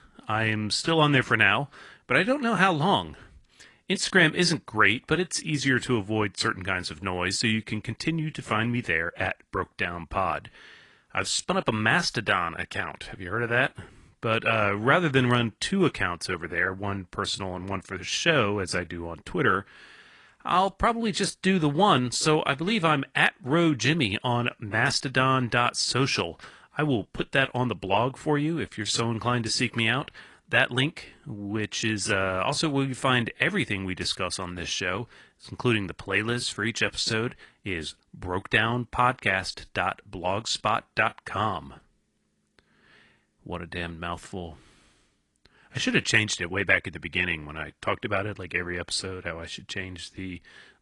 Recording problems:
garbled, watery; slightly

